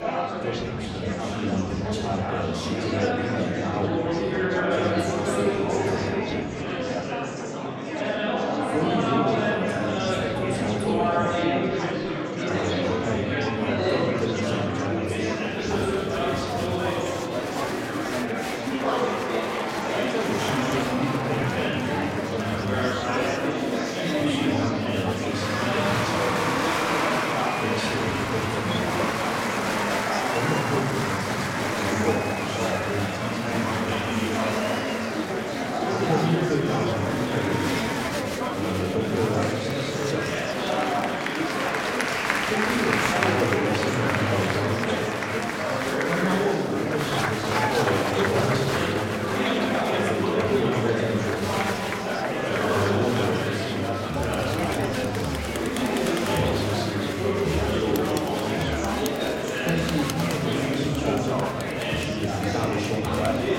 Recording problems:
off-mic speech; far
room echo; noticeable; dies away in 1.2 s
murmuring crowd; very loud; throughout; 4 dB above the speech
background music; faint; throughout; 25 dB below the speech

